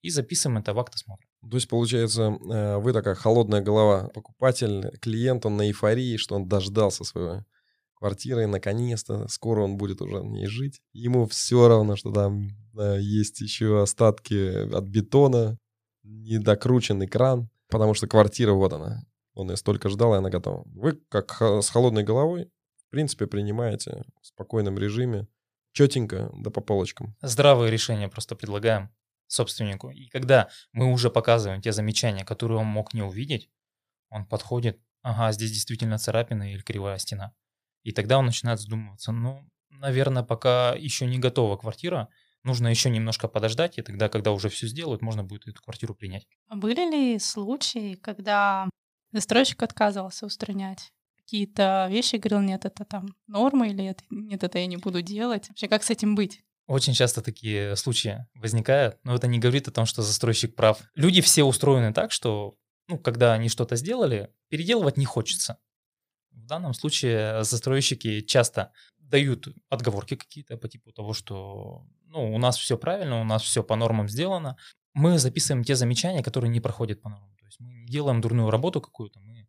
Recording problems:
none

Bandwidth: 15 kHz